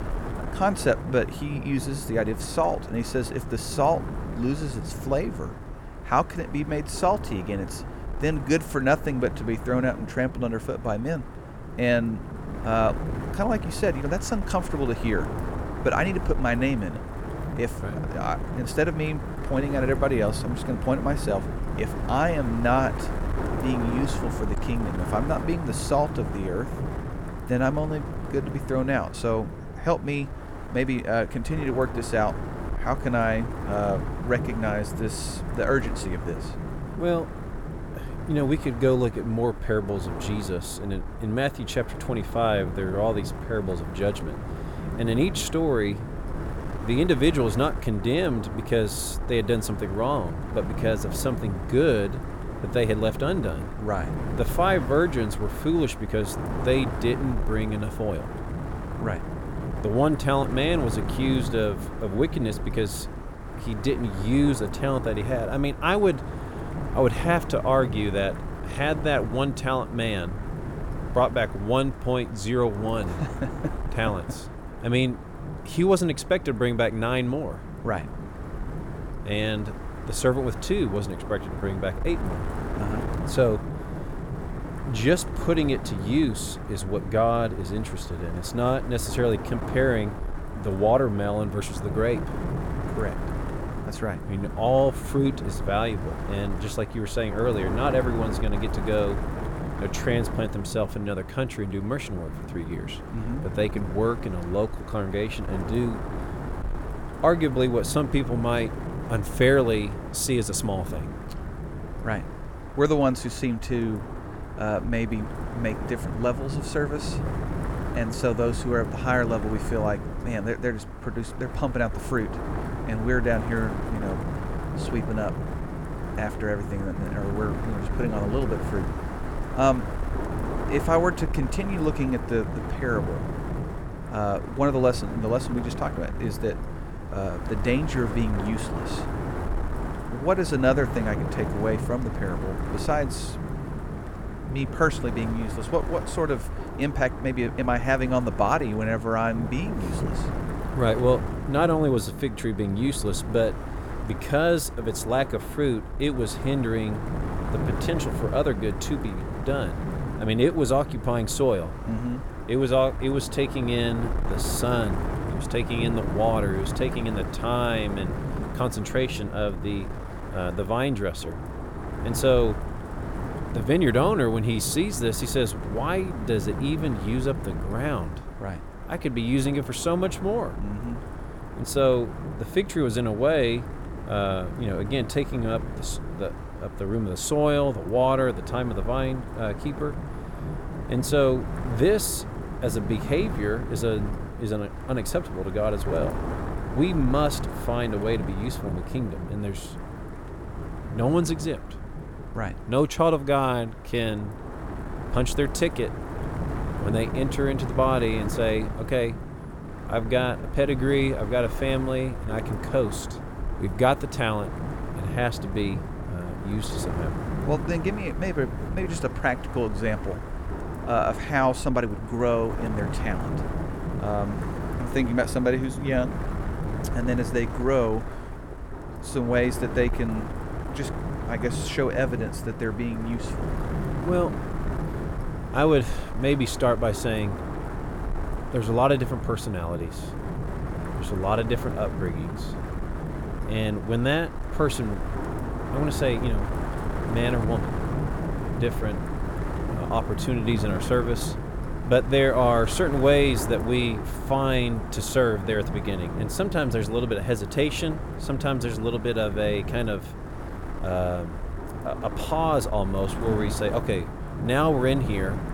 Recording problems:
wind noise on the microphone; heavy; 10 dB below the speech

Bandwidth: 17.5 kHz